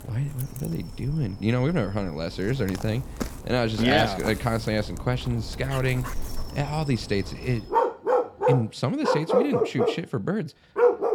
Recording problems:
animal sounds; loud; throughout; 2 dB below the speech

